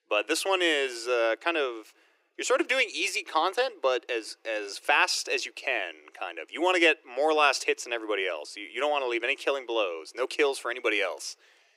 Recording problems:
thin; very; fading below 350 Hz

